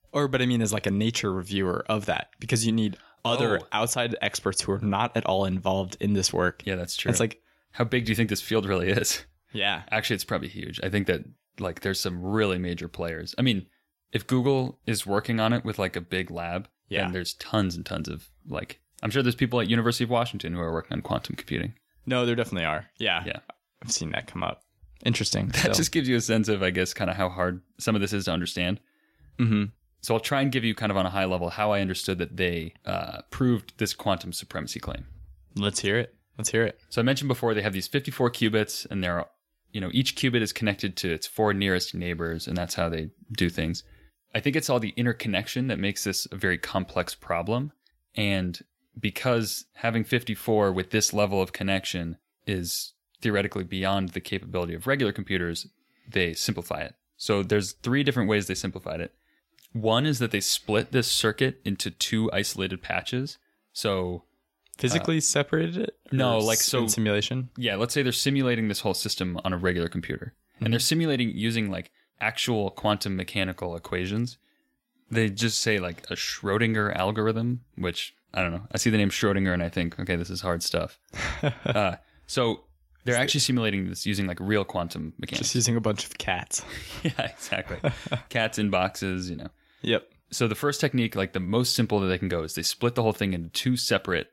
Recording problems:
none

